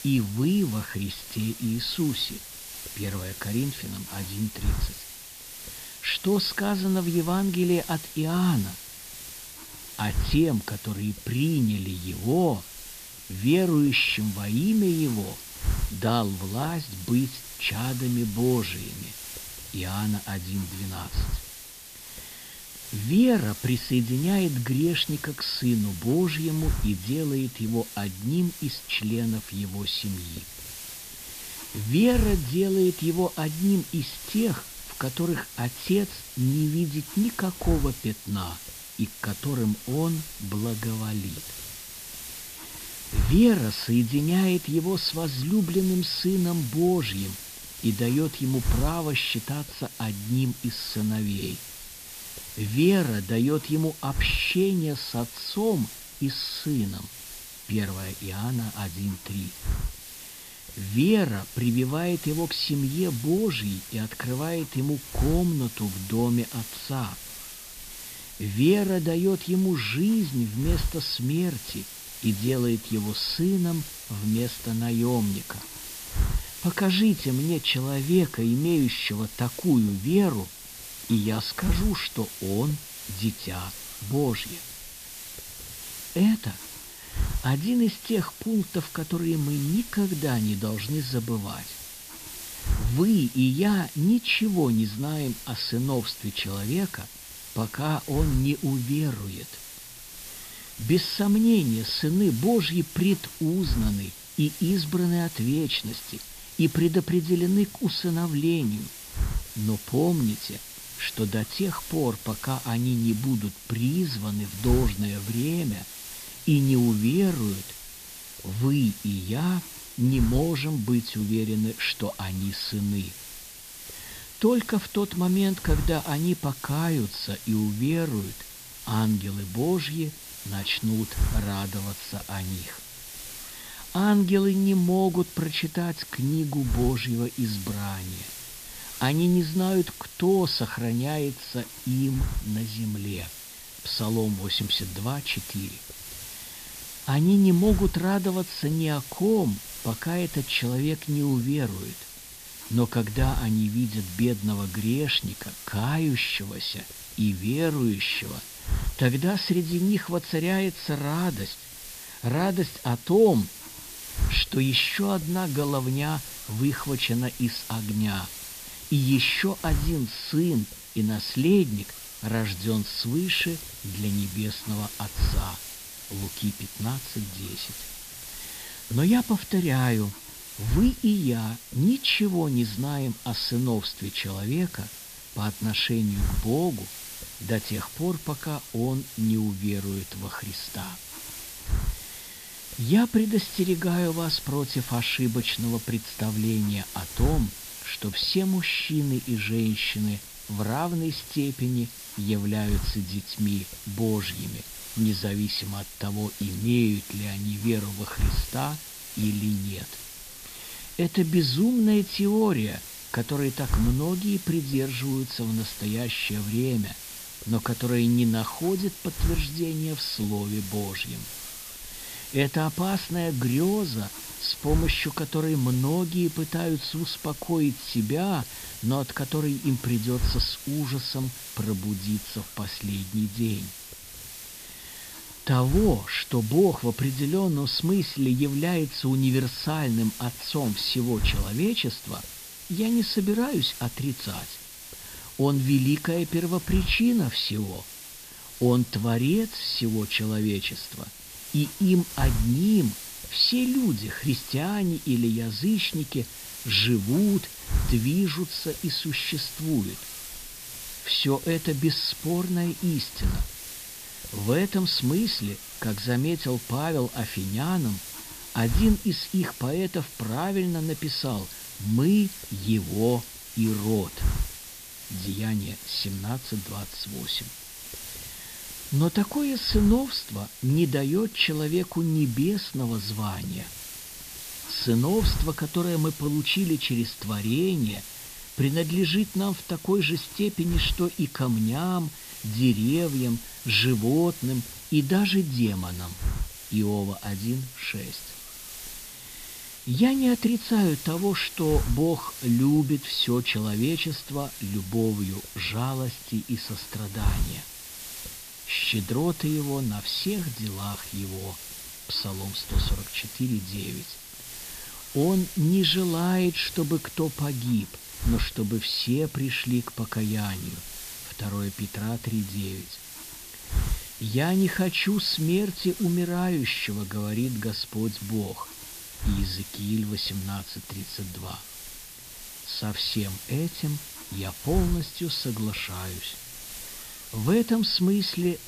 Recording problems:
high frequencies cut off; noticeable; nothing above 5.5 kHz
hiss; noticeable; throughout; 10 dB below the speech

